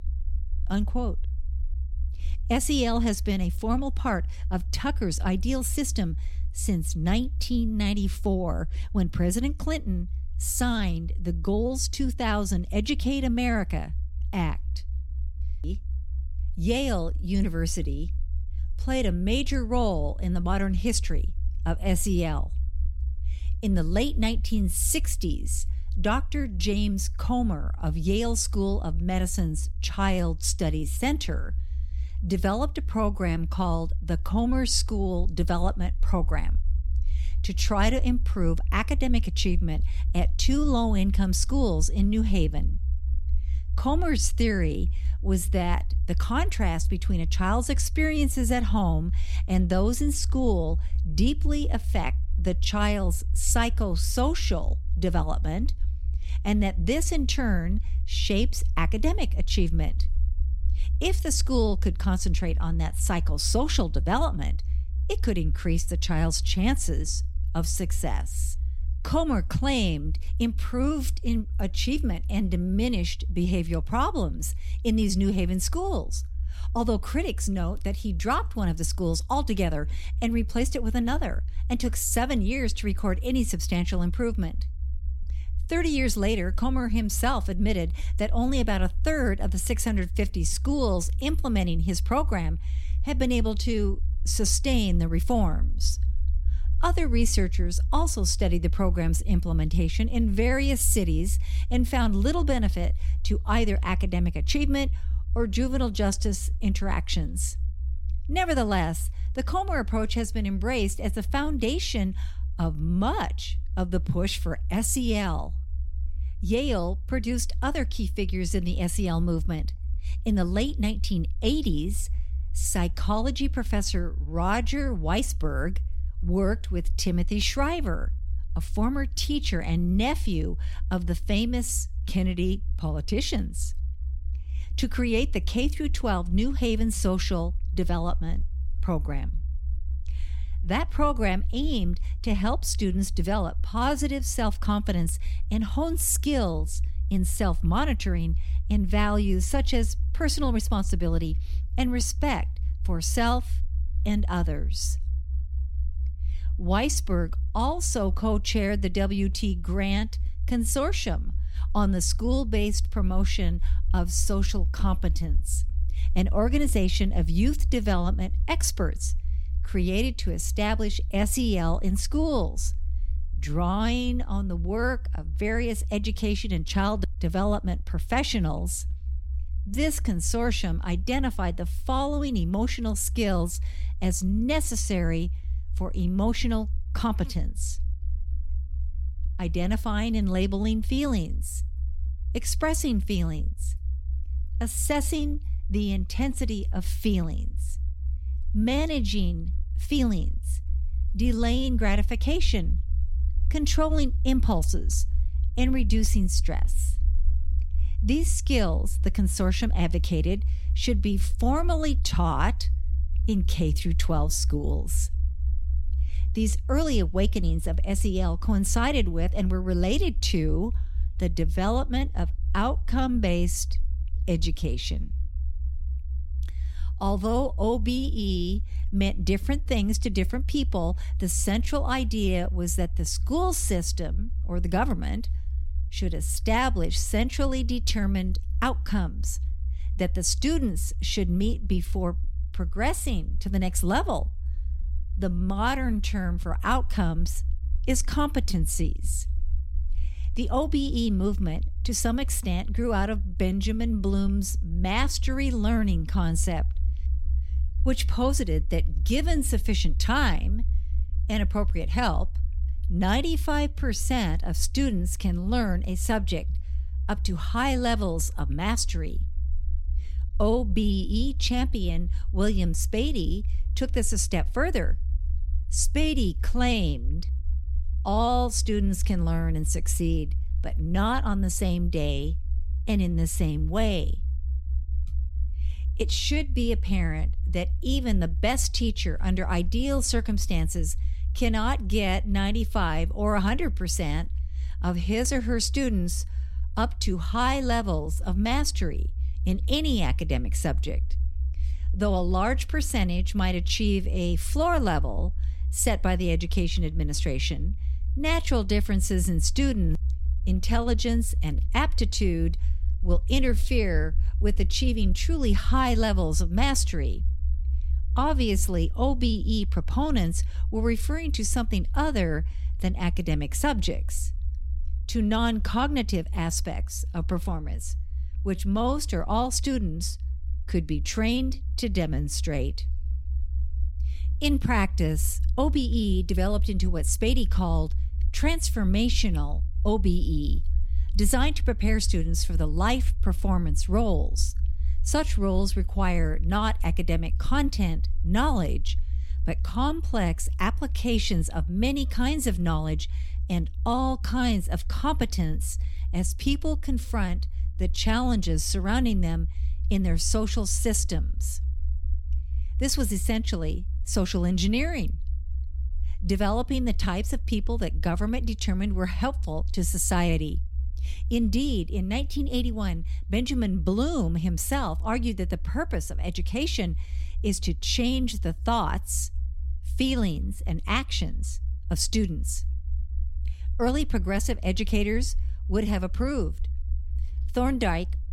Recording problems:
low rumble; faint; throughout; 20 dB below the speech

